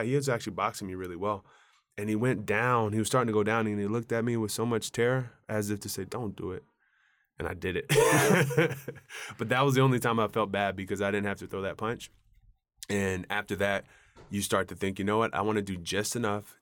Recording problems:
abrupt cut into speech; at the start

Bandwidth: 18 kHz